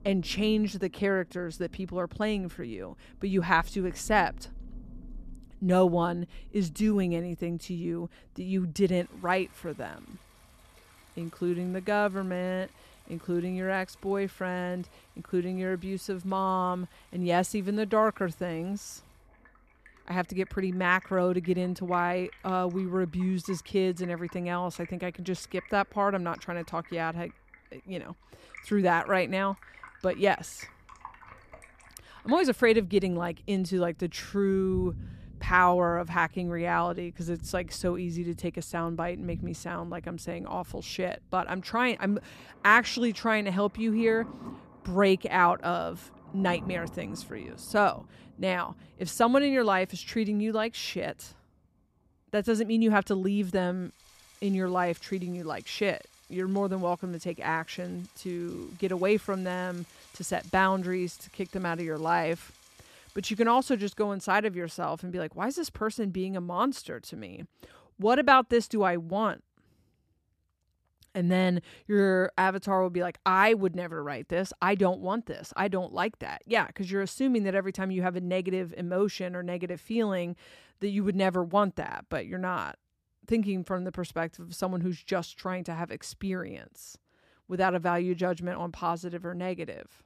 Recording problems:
rain or running water; faint; until 1:04; 20 dB below the speech

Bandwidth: 14.5 kHz